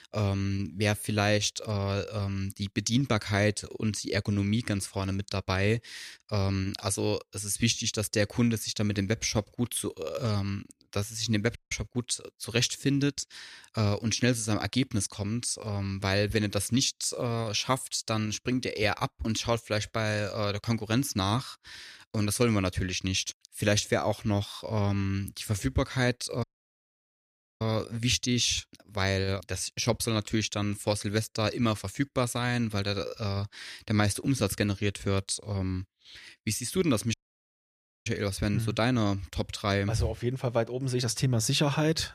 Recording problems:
audio cutting out; at 12 s, at 26 s for 1 s and at 37 s for 1 s

